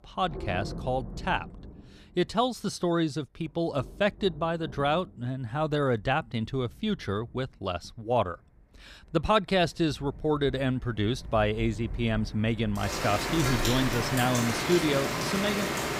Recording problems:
rain or running water; loud; throughout; 4 dB below the speech

